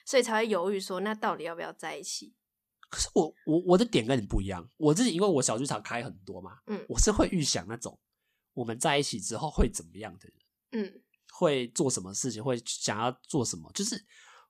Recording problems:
none

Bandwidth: 14.5 kHz